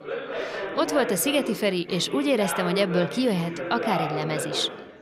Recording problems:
background chatter; loud; throughout; 4 voices, 6 dB below the speech

